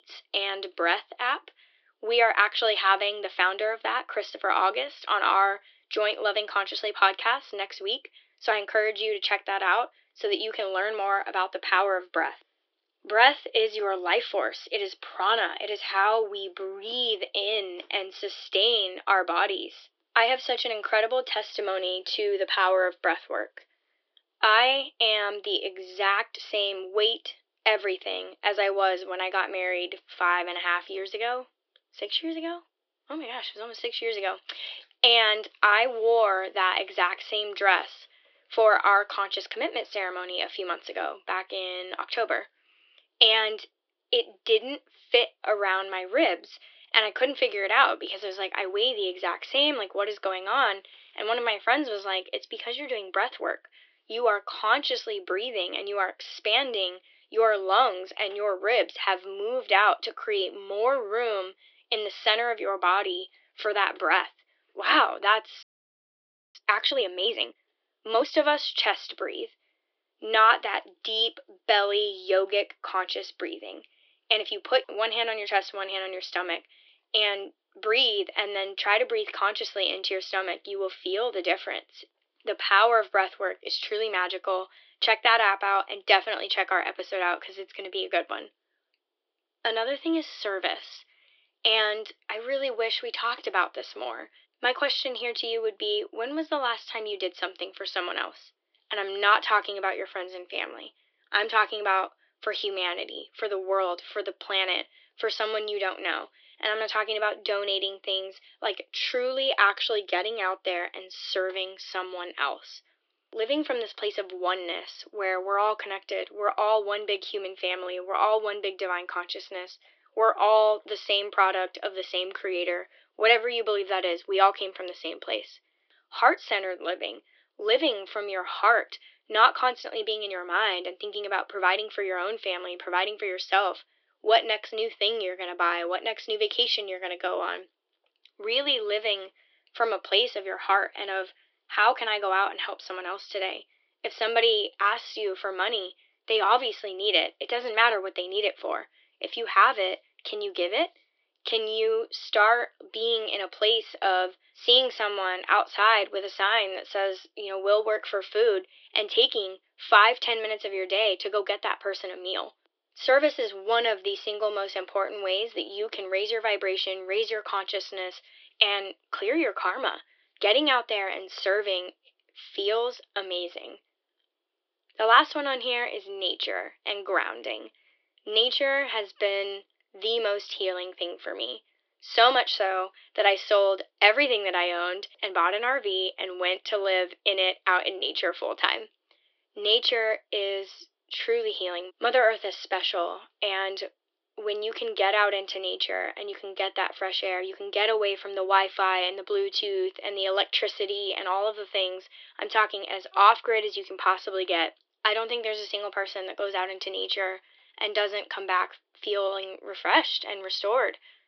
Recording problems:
thin; very; fading below 350 Hz
high frequencies cut off; noticeable; nothing above 5.5 kHz
audio freezing; at 1:06 for 1 s

